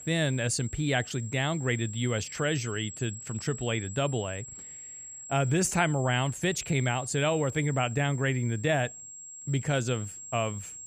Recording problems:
high-pitched whine; noticeable; throughout; 7.5 kHz, 10 dB below the speech

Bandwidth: 15 kHz